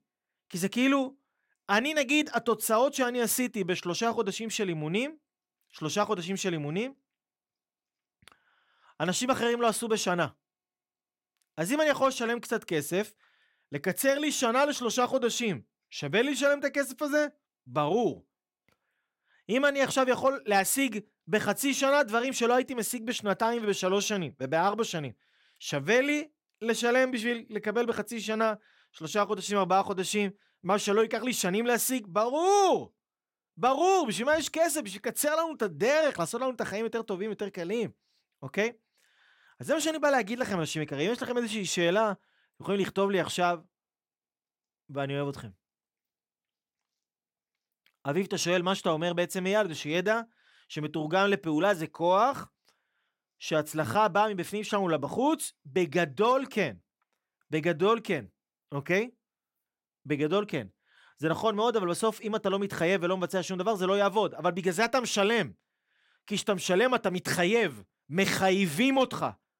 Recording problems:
none

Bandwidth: 16.5 kHz